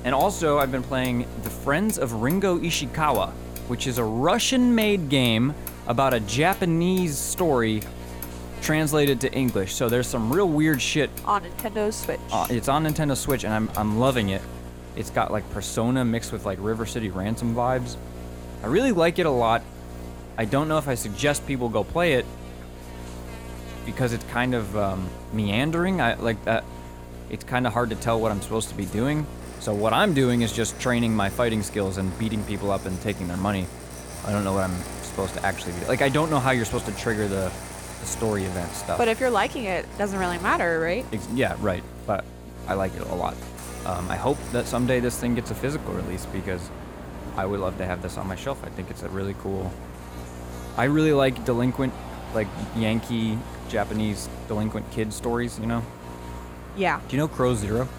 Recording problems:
electrical hum; noticeable; throughout; 60 Hz, 15 dB below the speech
traffic noise; noticeable; throughout; 15 dB below the speech
murmuring crowd; faint; throughout; 30 dB below the speech

